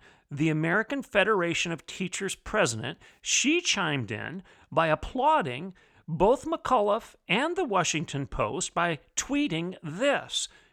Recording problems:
none

